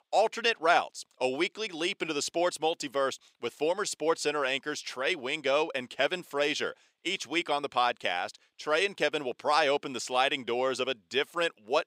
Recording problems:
thin; somewhat; fading below 450 Hz

